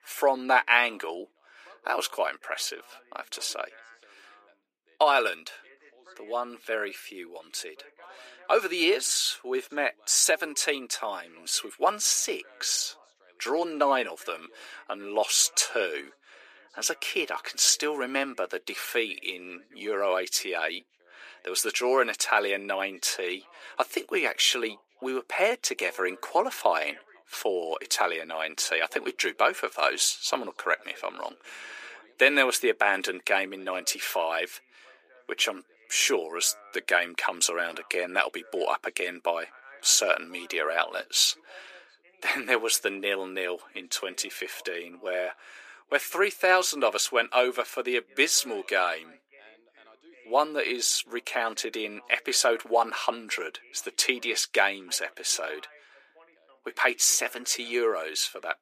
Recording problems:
thin; very; fading below 350 Hz
background chatter; faint; throughout; 2 voices, 30 dB below the speech

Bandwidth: 14.5 kHz